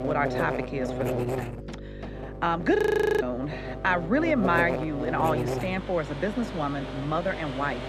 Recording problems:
muffled; very slightly; fading above 3.5 kHz
electrical hum; loud; throughout; 50 Hz, 7 dB below the speech
household noises; noticeable; throughout; 15 dB below the speech
audio freezing; at 3 s

